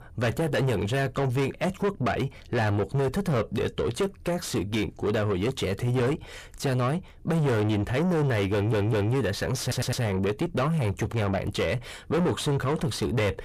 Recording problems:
distortion; heavy; 6 dB below the speech
audio stuttering; at 8.5 s and at 9.5 s

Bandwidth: 15 kHz